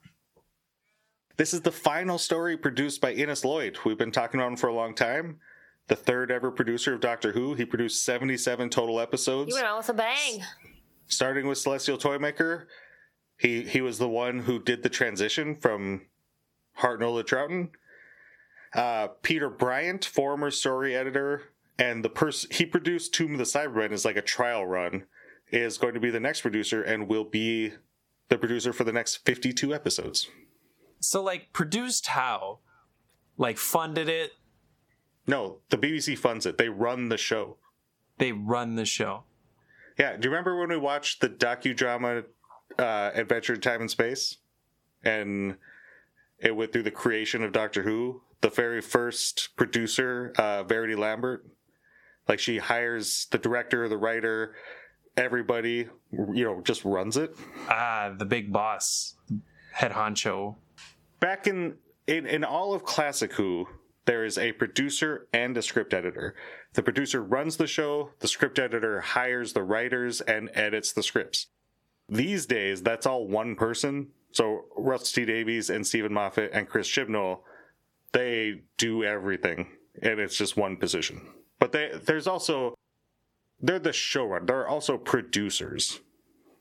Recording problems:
squashed, flat; somewhat

